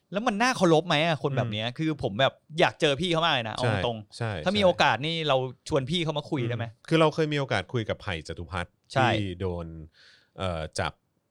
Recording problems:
none

